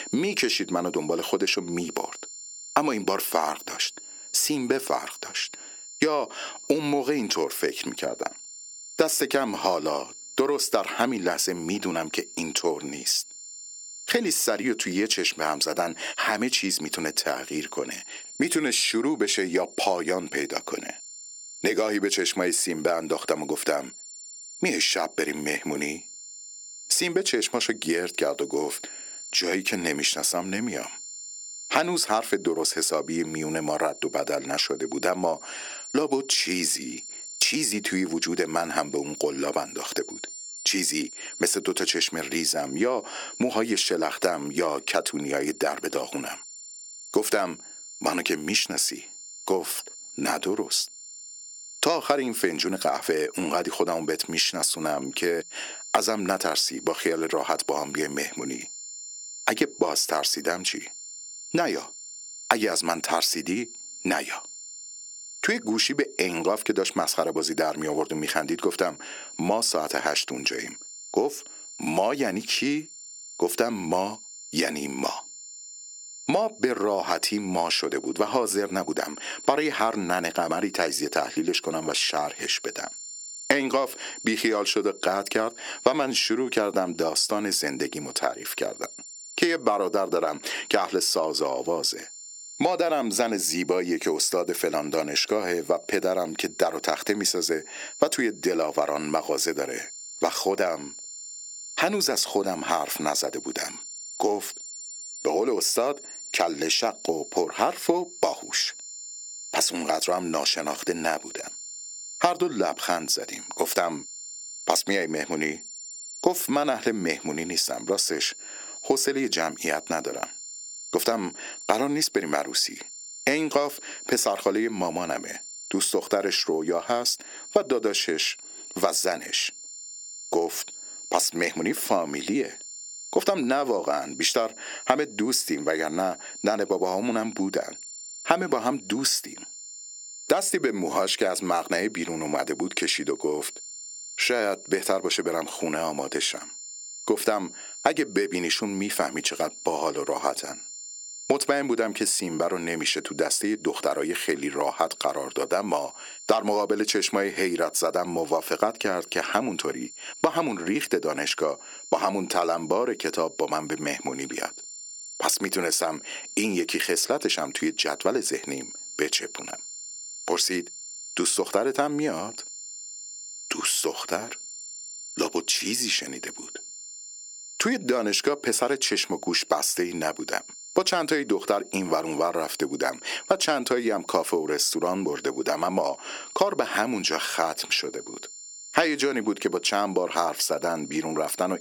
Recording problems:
thin; somewhat; fading below 300 Hz
squashed, flat; somewhat
high-pitched whine; noticeable; throughout; 7 kHz, 15 dB below the speech

